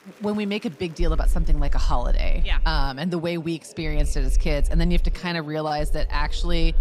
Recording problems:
murmuring crowd; faint; throughout; 20 dB below the speech
low rumble; faint; from 1 to 3 s, from 4 to 5 s and from 6 s on; 25 dB below the speech

